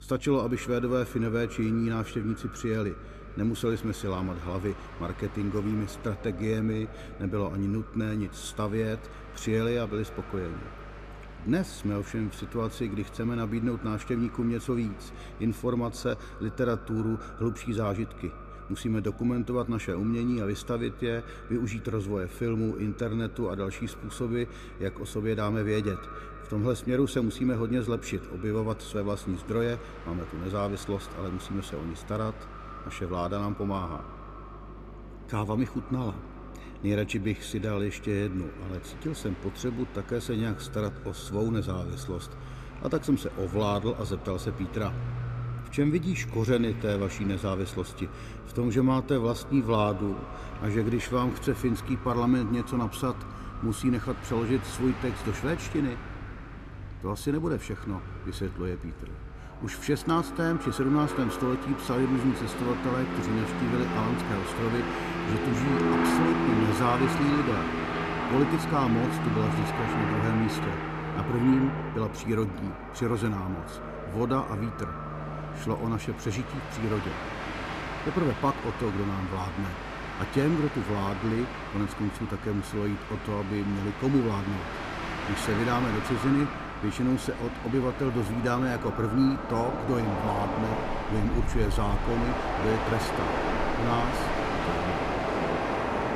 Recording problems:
echo of what is said; noticeable; throughout; 130 ms later, 15 dB below the speech
train or aircraft noise; loud; throughout; 4 dB below the speech
electrical hum; faint; throughout; 50 Hz, 30 dB below the speech

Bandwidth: 14.5 kHz